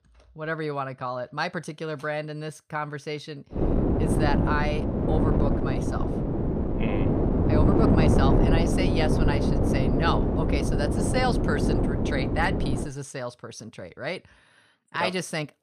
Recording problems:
wind noise on the microphone; heavy; from 3.5 to 13 s; 1 dB above the speech

